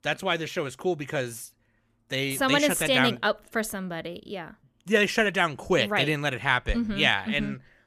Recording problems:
none

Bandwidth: 14.5 kHz